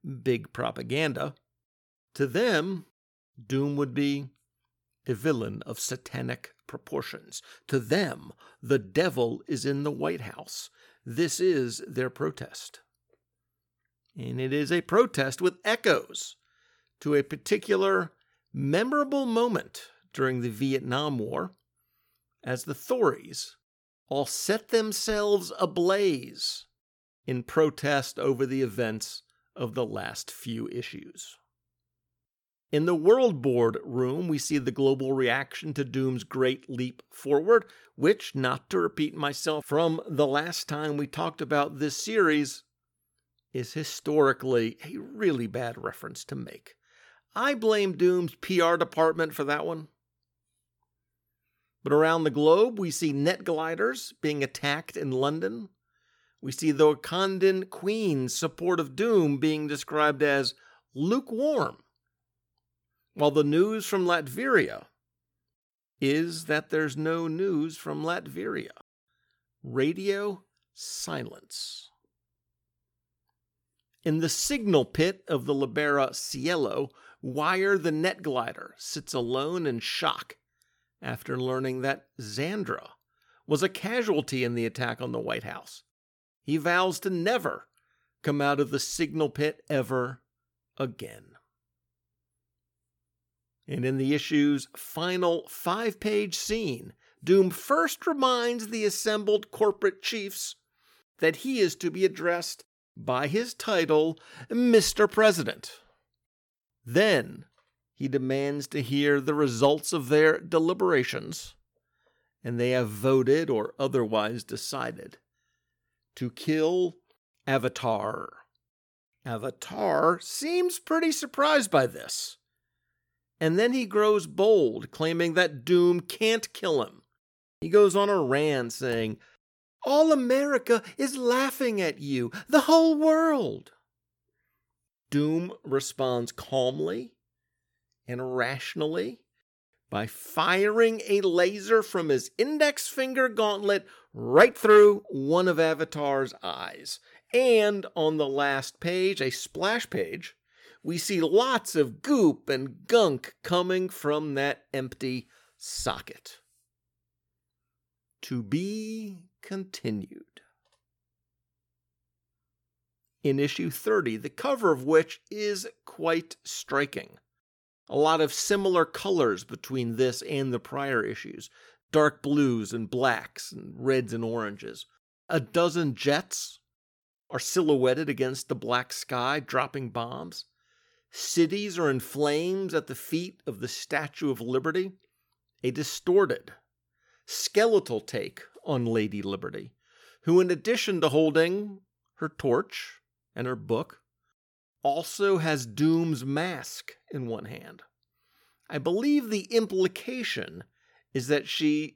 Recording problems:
none

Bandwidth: 18 kHz